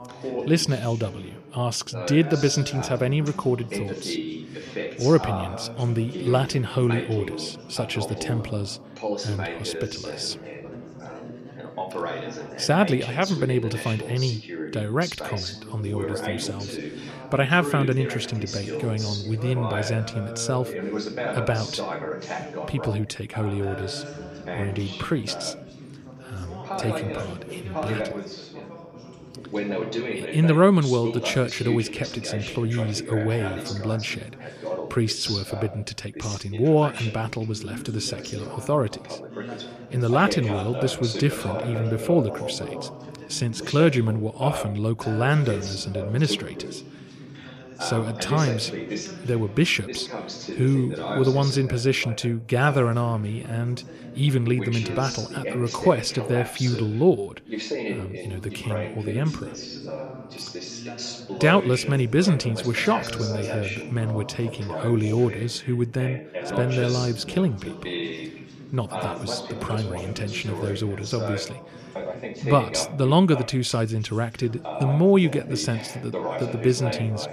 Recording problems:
background chatter; loud; throughout; 2 voices, 8 dB below the speech

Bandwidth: 15 kHz